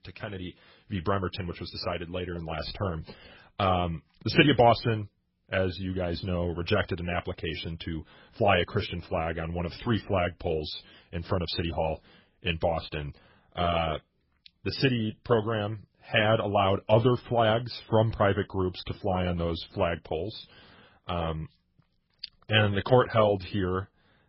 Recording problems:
garbled, watery; badly; nothing above 5.5 kHz

